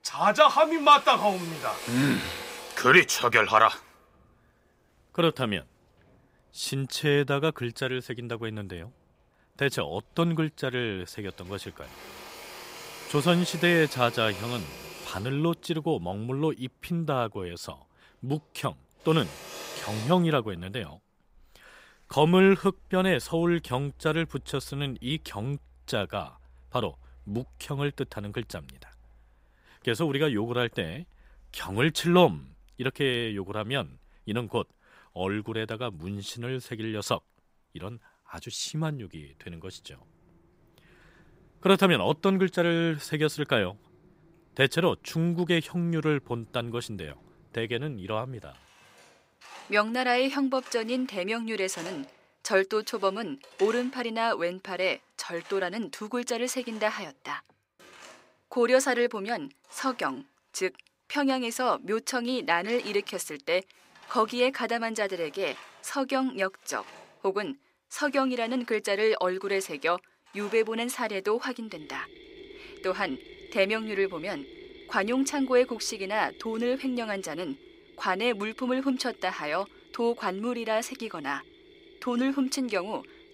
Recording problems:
machinery noise; noticeable; throughout; 20 dB below the speech

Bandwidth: 15.5 kHz